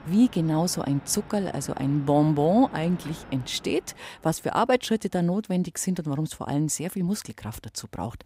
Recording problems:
machinery noise; noticeable; throughout; 20 dB below the speech

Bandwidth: 15.5 kHz